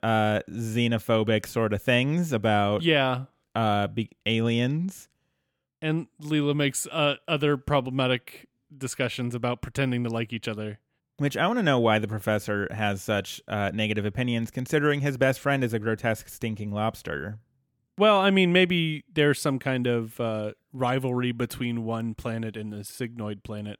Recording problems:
none

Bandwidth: 18 kHz